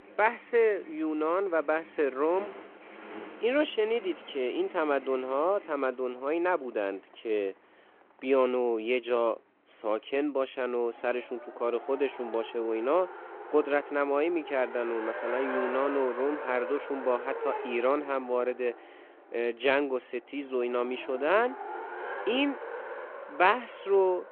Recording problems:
phone-call audio
traffic noise; noticeable; throughout; 10 dB below the speech

